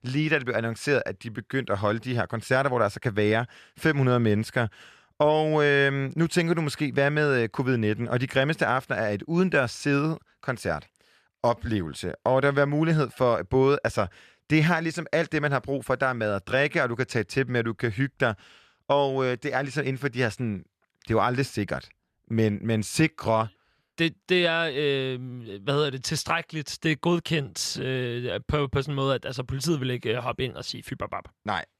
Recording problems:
none

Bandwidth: 14.5 kHz